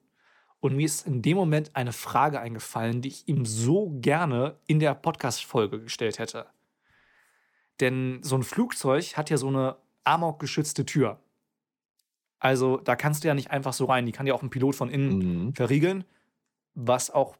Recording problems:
none

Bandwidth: 17.5 kHz